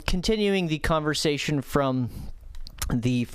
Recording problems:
squashed, flat; somewhat

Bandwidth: 14.5 kHz